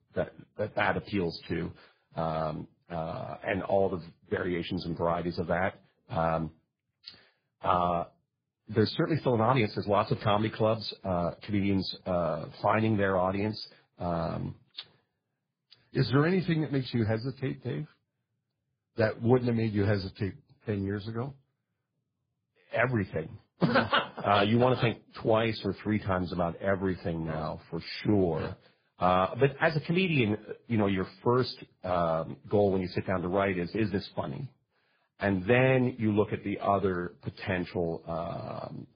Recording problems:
garbled, watery; badly; nothing above 4 kHz

